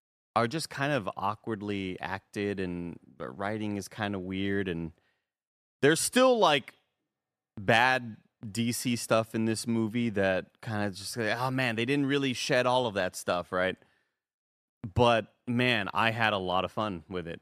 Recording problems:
none

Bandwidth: 14.5 kHz